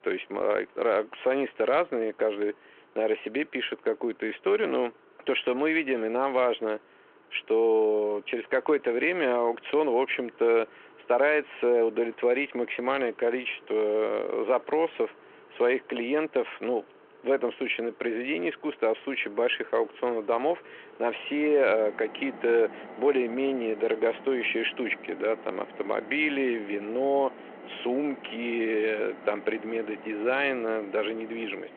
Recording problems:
phone-call audio
traffic noise; faint; throughout; 20 dB below the speech

